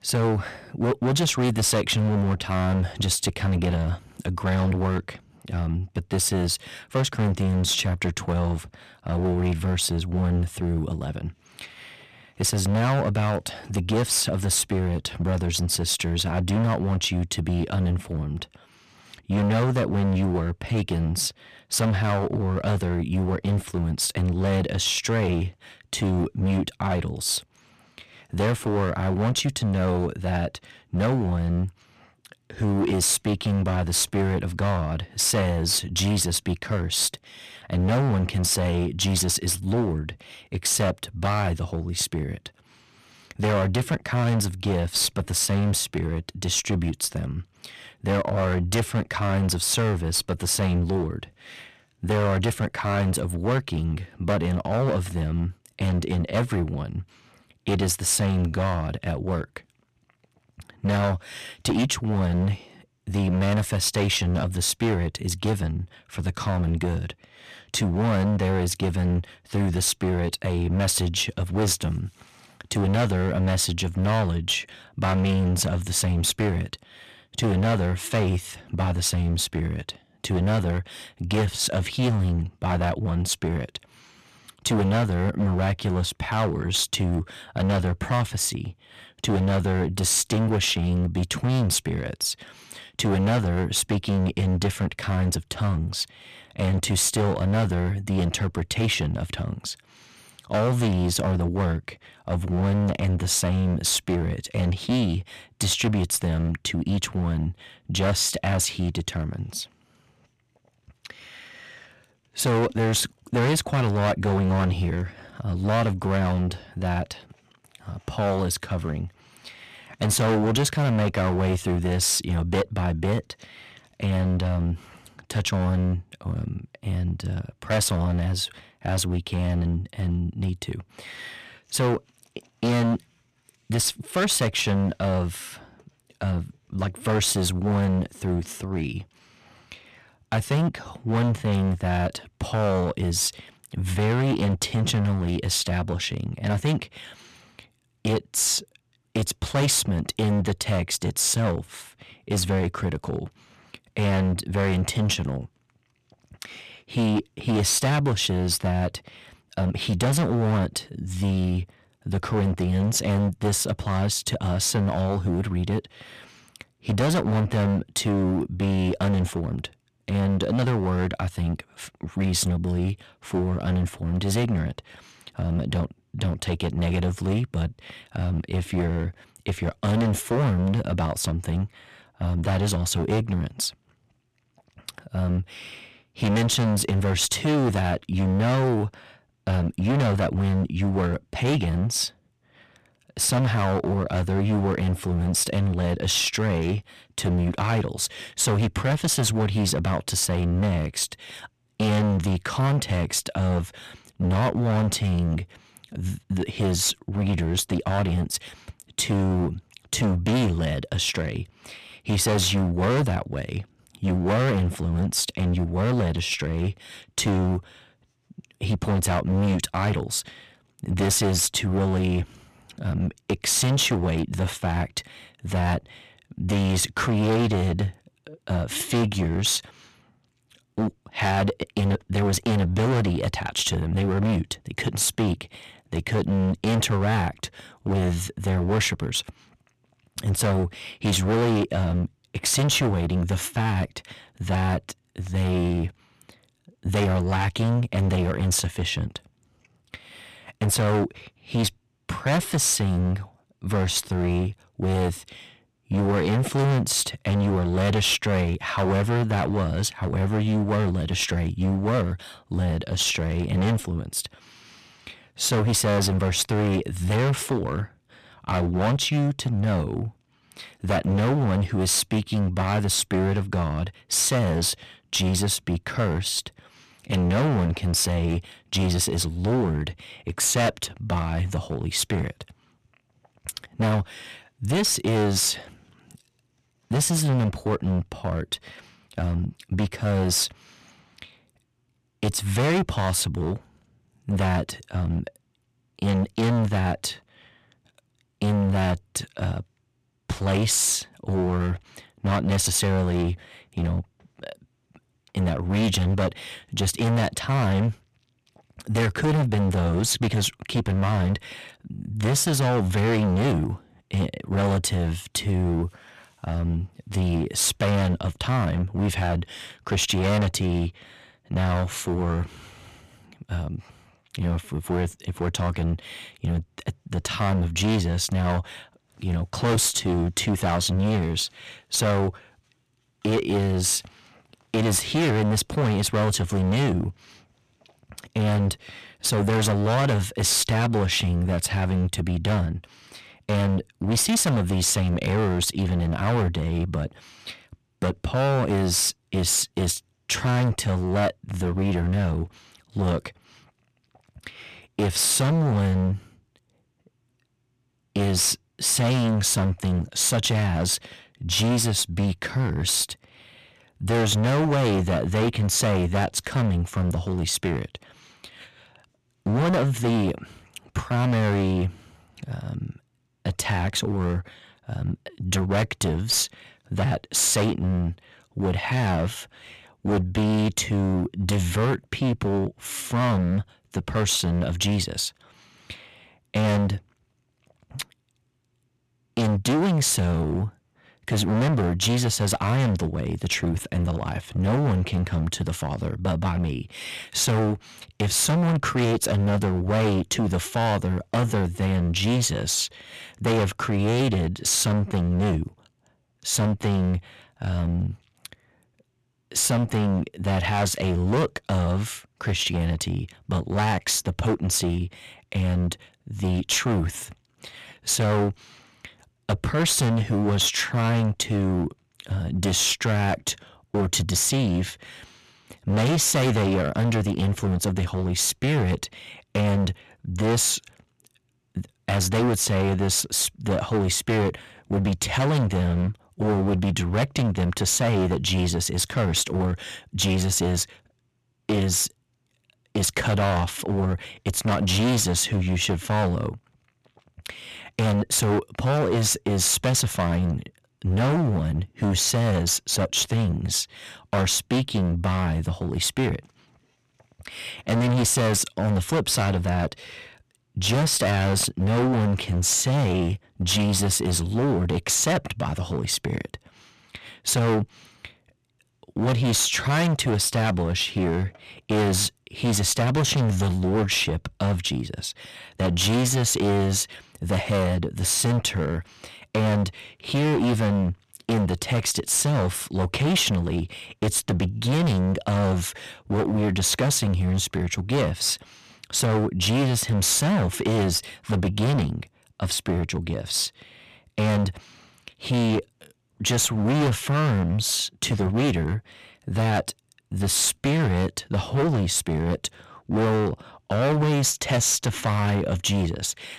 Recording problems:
distortion; heavy; 17% of the sound clipped

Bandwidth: 14 kHz